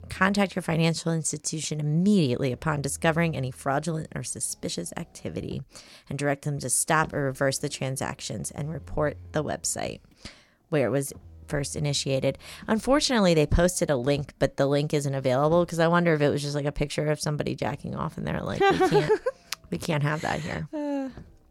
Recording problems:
traffic noise; faint; throughout; 25 dB below the speech

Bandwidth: 17 kHz